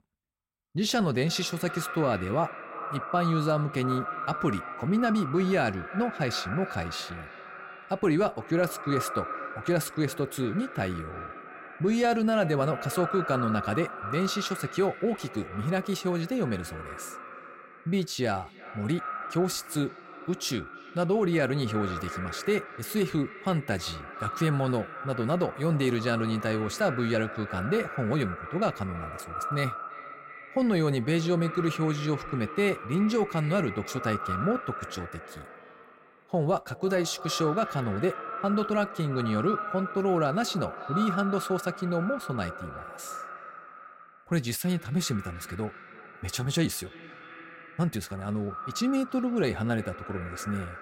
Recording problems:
echo of what is said; strong; throughout; 330 ms later, 9 dB below the speech

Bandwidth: 16 kHz